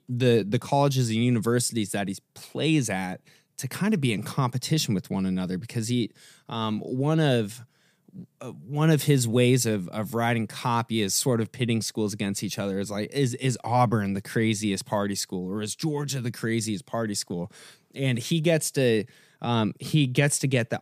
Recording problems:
none

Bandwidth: 15 kHz